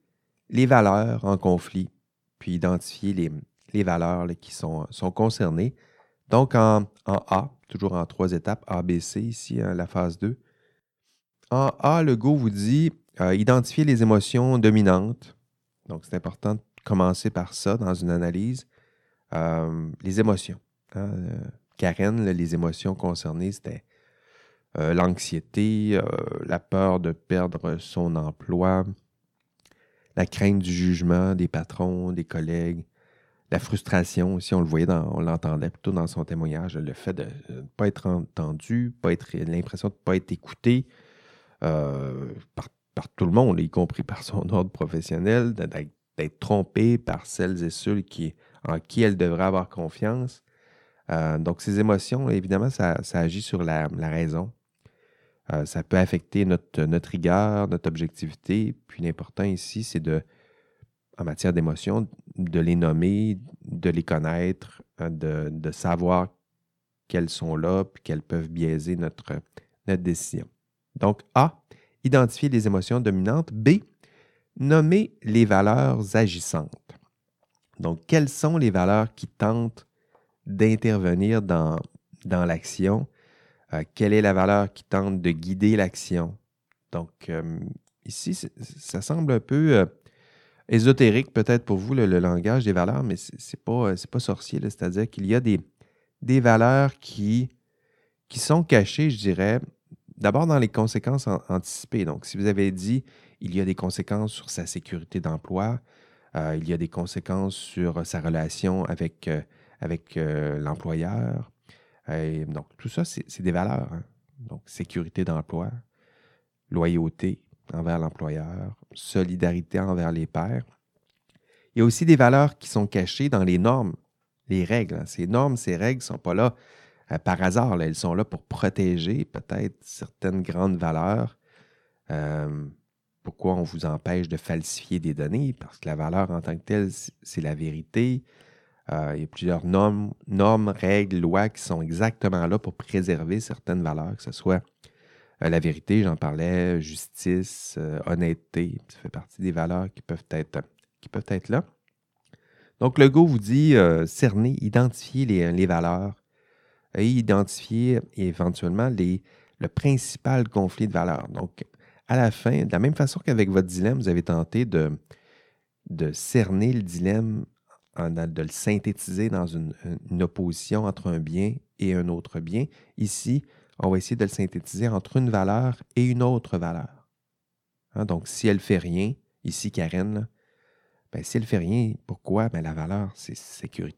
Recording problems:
none

